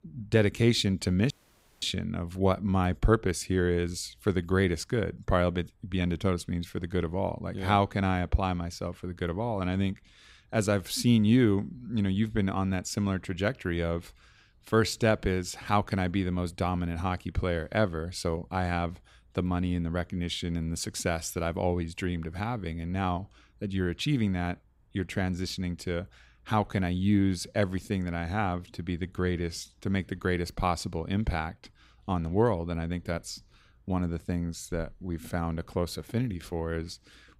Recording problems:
audio cutting out; at 1.5 s for 0.5 s

